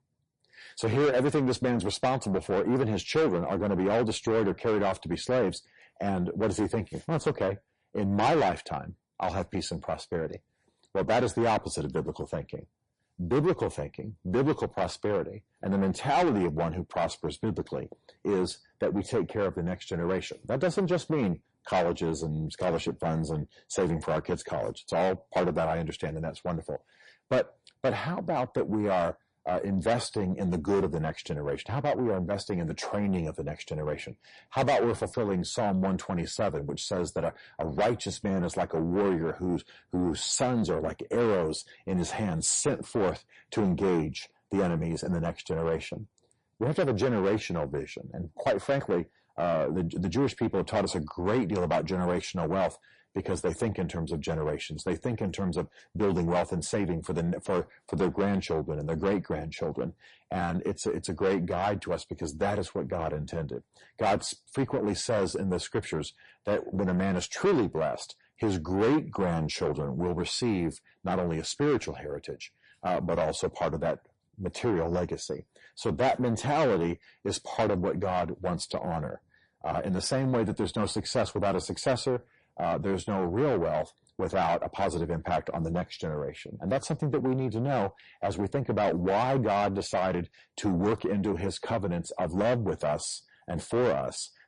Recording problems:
distortion; heavy; 7 dB below the speech
garbled, watery; slightly; nothing above 9.5 kHz

